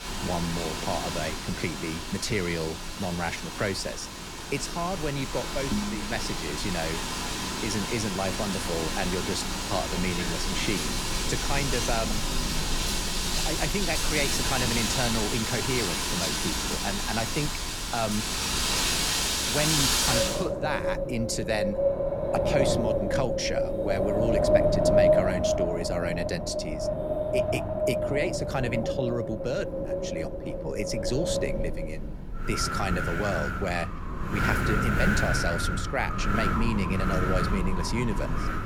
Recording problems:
wind in the background; very loud; throughout; 3 dB above the speech

